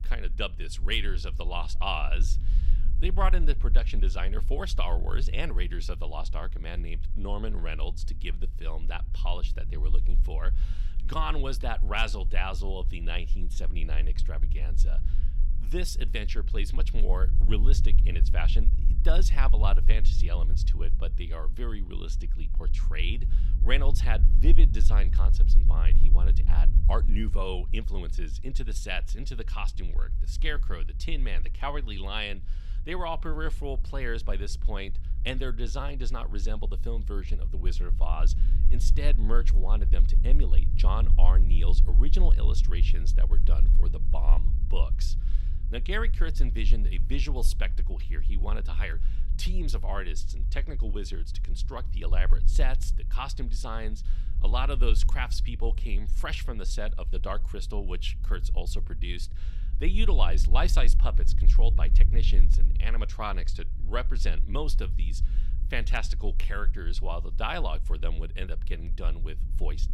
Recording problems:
low rumble; noticeable; throughout; 15 dB below the speech

